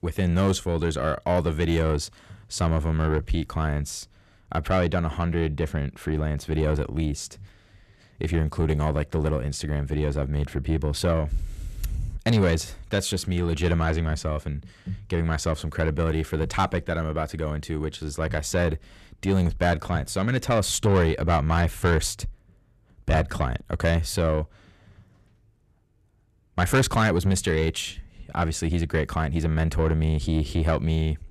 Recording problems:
distortion; slight; 10 dB below the speech

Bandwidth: 14 kHz